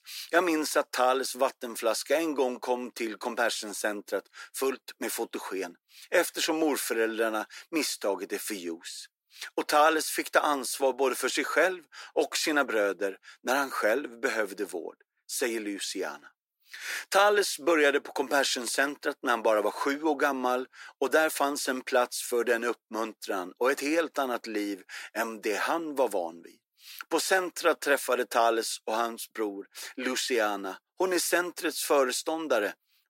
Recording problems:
thin; very; fading below 350 Hz

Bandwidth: 16 kHz